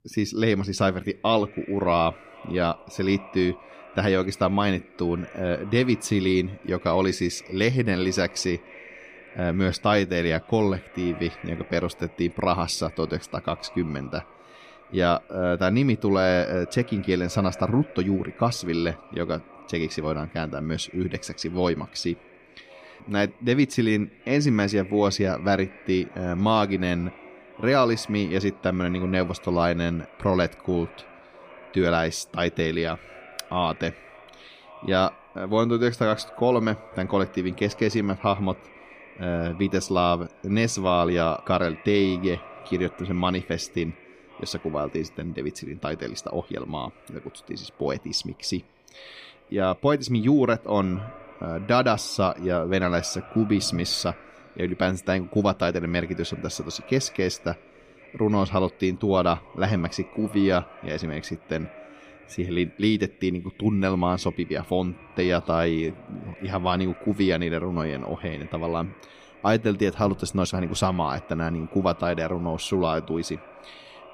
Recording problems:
echo of what is said; faint; throughout; 520 ms later, 20 dB below the speech

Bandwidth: 15 kHz